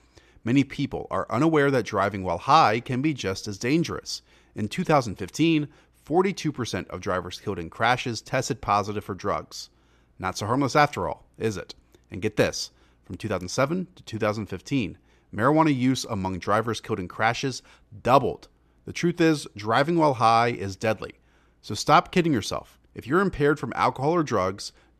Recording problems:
none

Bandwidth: 13.5 kHz